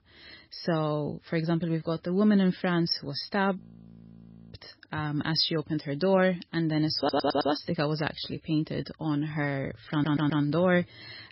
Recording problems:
garbled, watery; badly; nothing above 5.5 kHz
audio freezing; at 3.5 s for 1 s
audio stuttering; at 7 s and at 10 s

